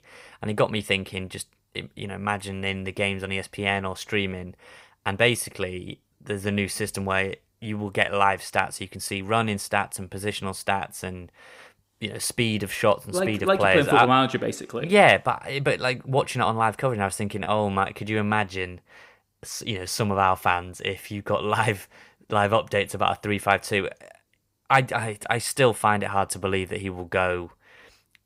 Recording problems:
none

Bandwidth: 15.5 kHz